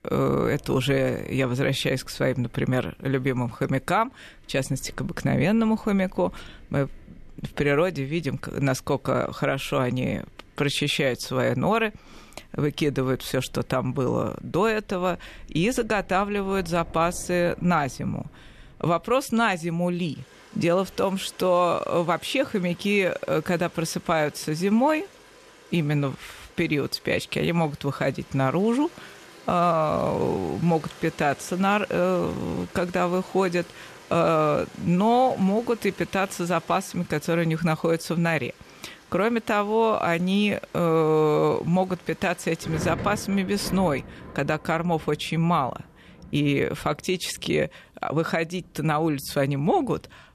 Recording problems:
rain or running water; faint; throughout; 20 dB below the speech

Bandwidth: 13.5 kHz